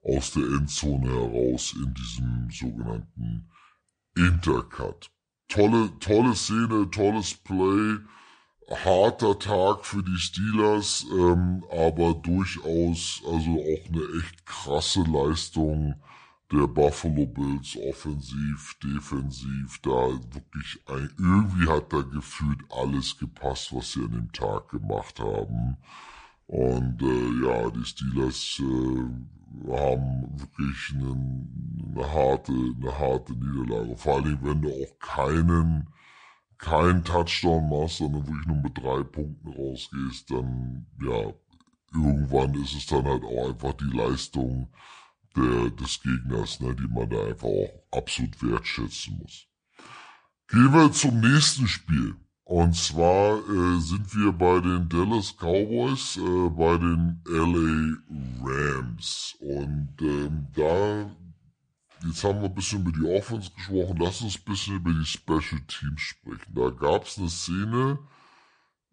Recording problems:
wrong speed and pitch; too slow and too low; 0.7 times normal speed

